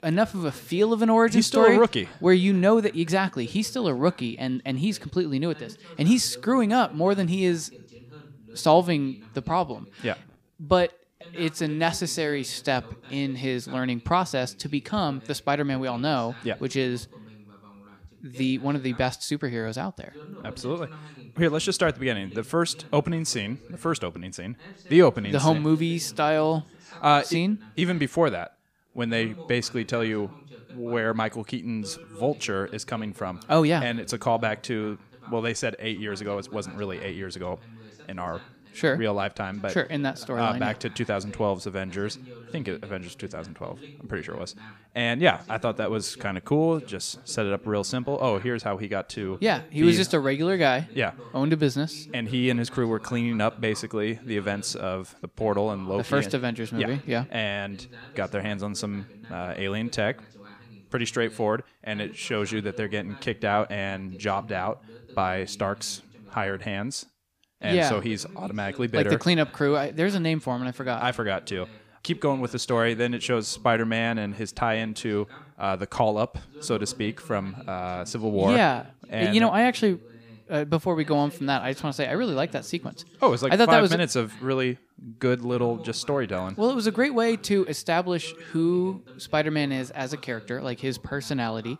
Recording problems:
voice in the background; faint; throughout; 20 dB below the speech

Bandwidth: 15 kHz